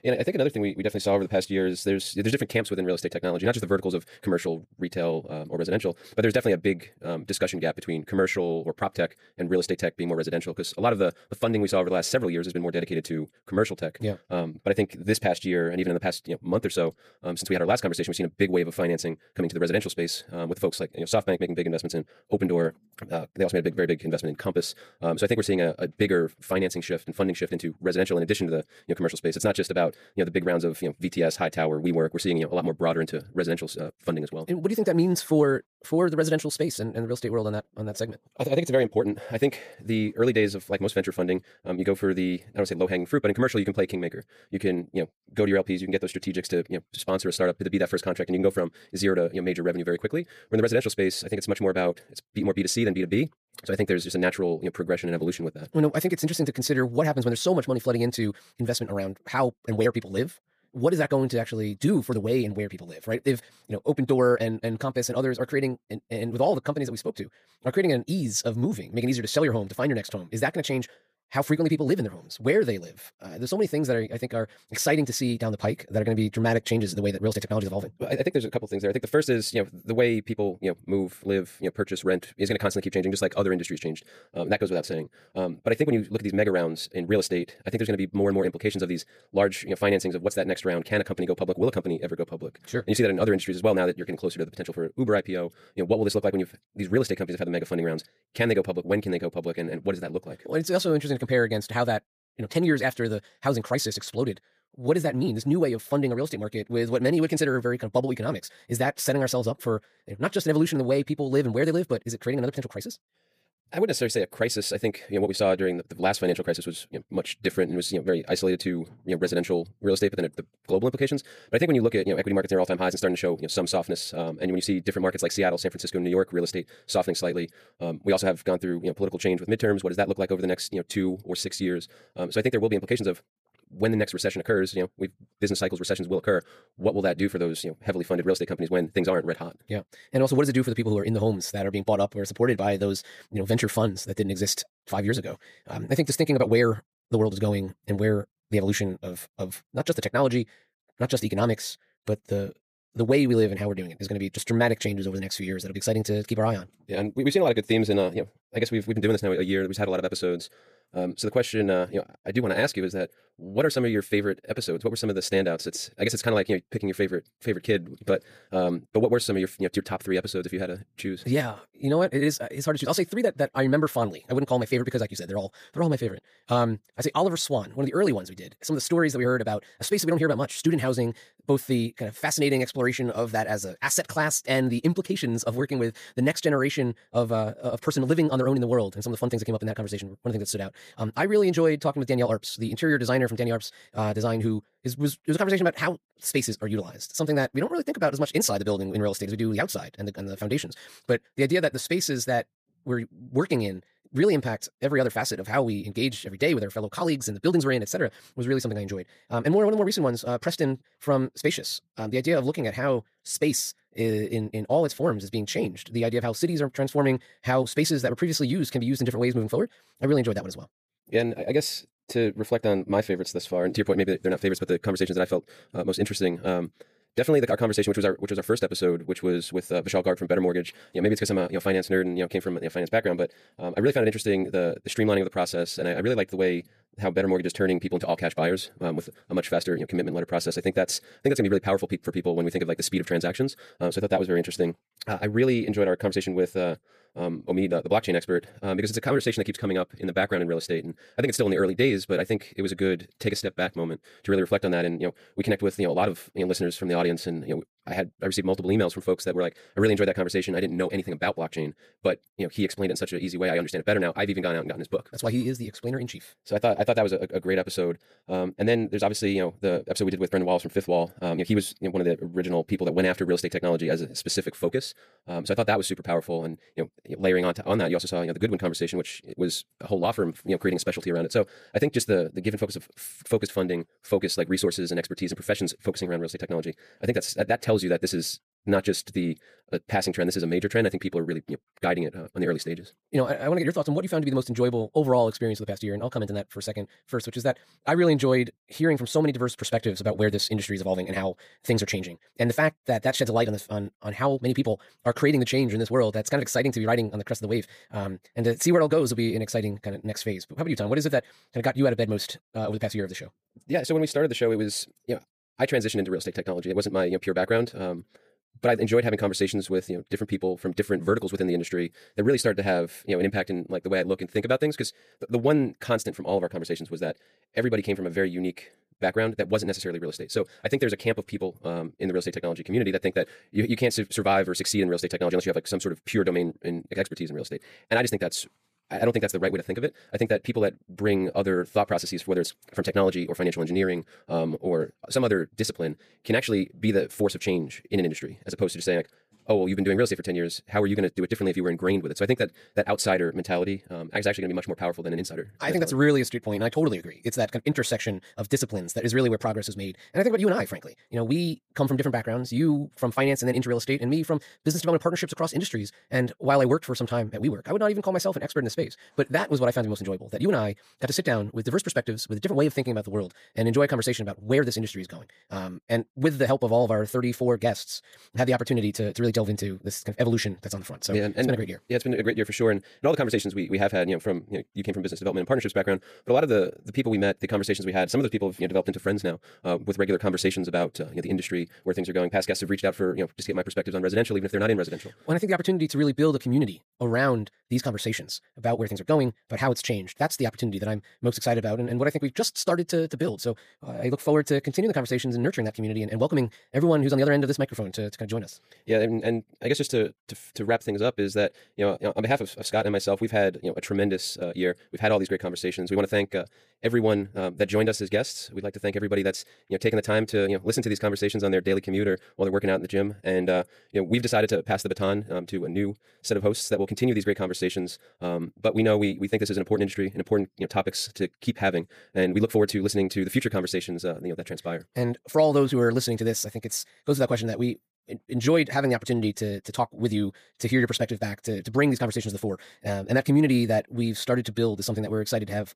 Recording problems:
wrong speed, natural pitch; too fast; 1.8 times normal speed

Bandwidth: 15 kHz